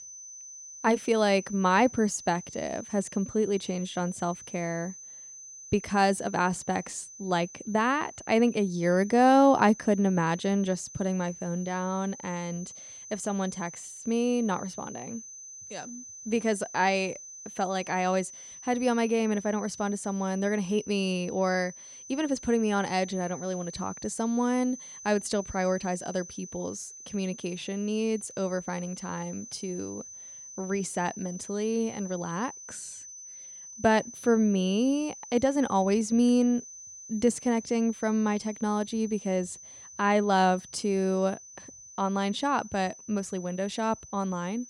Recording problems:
high-pitched whine; noticeable; throughout; 6 kHz, 15 dB below the speech

